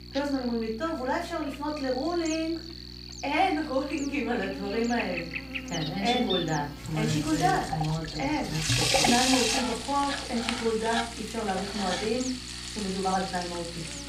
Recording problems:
room echo; slight; dies away in 0.3 s
off-mic speech; somewhat distant
electrical hum; loud; throughout; 60 Hz, 9 dB below the speech
household noises; loud; from 7 s on; 1 dB below the speech

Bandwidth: 15.5 kHz